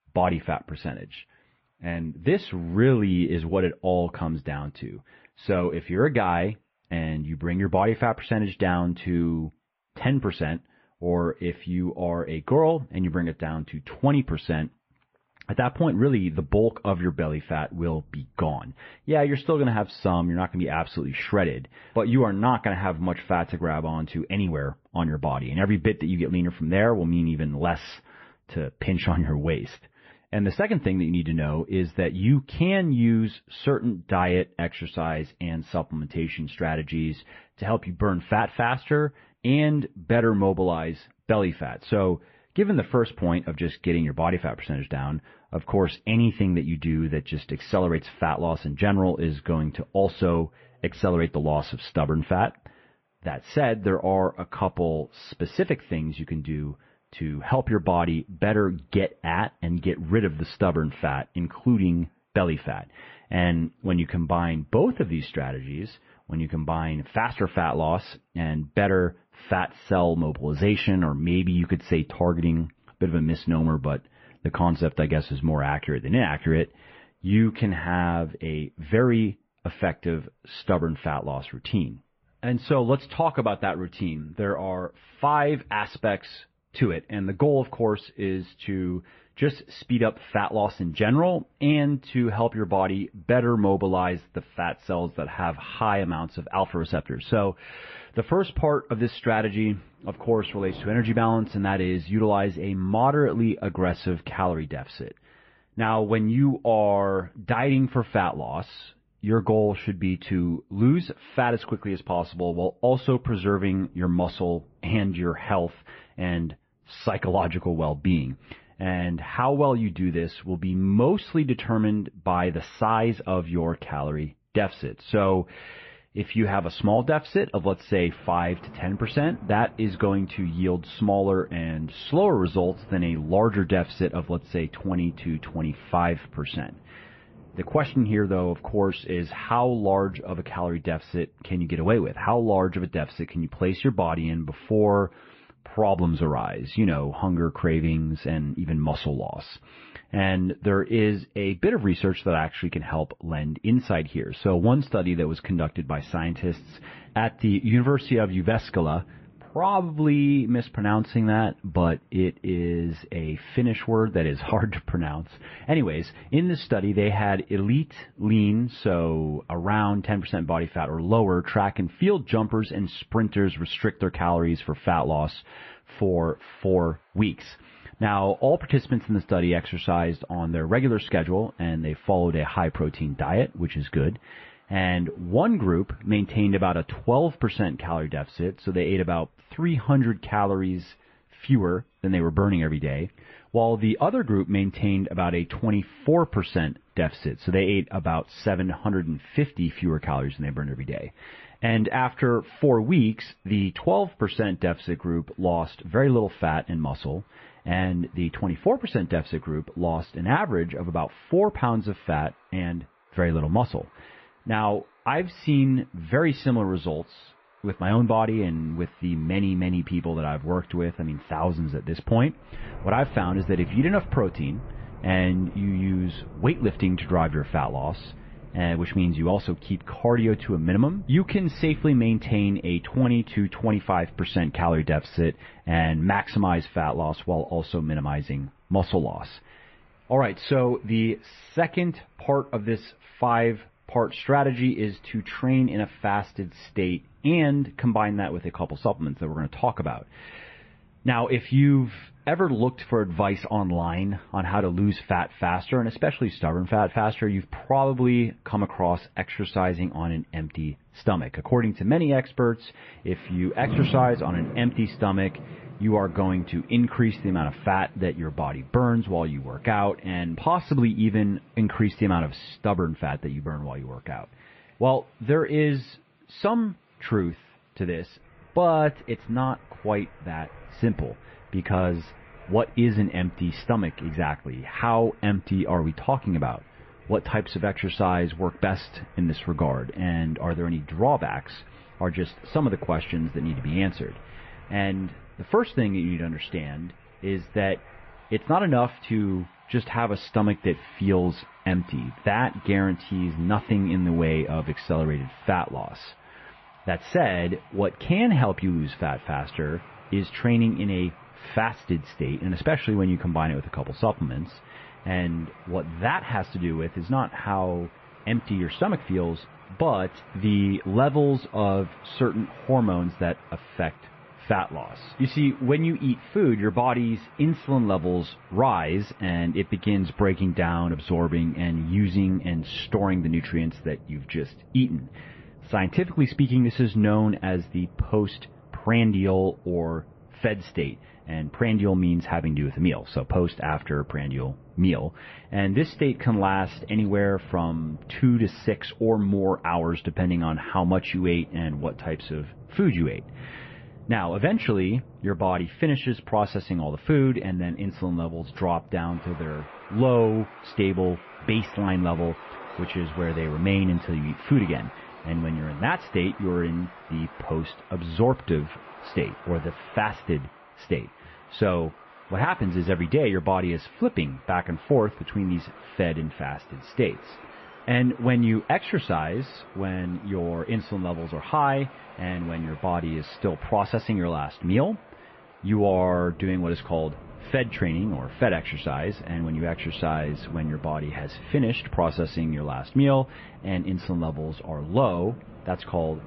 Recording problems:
garbled, watery; slightly; nothing above 5.5 kHz
muffled; very slightly; fading above 3 kHz
rain or running water; faint; throughout; 20 dB below the speech

